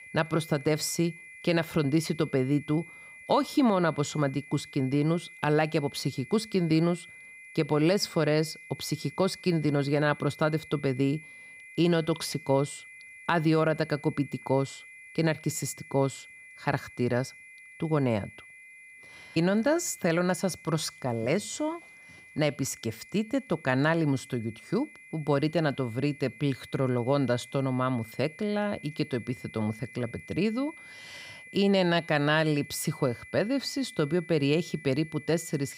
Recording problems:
high-pitched whine; noticeable; throughout; 2 kHz, 20 dB below the speech

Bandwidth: 15.5 kHz